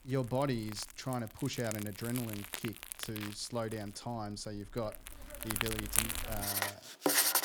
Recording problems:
household noises; very loud; throughout; 4 dB above the speech
crackle, like an old record; faint; 30 dB below the speech

